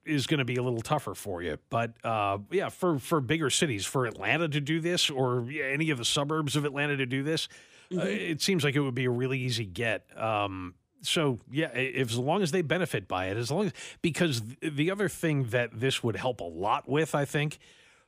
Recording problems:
none

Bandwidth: 15 kHz